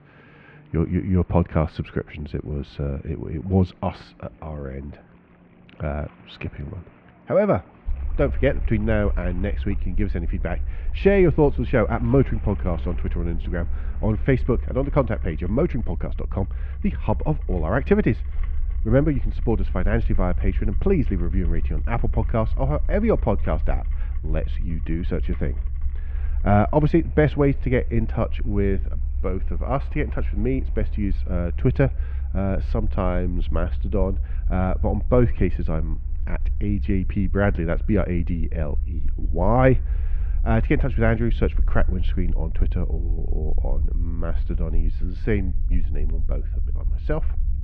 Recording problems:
muffled; very; fading above 2.5 kHz
rain or running water; faint; throughout; 25 dB below the speech
low rumble; faint; from 8 s on; 20 dB below the speech

